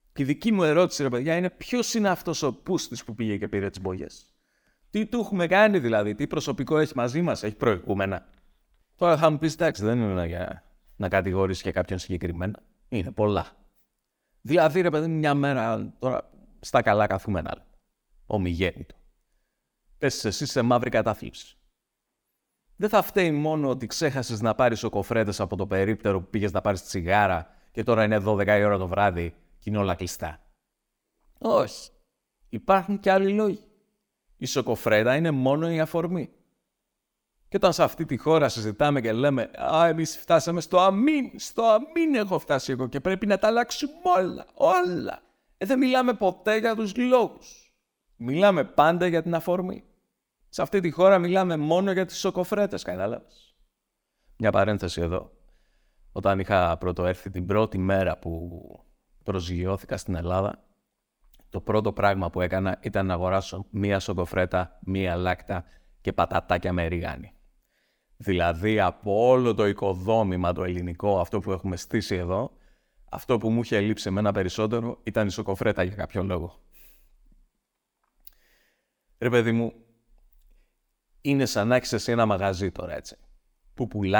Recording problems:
abrupt cut into speech; at the end

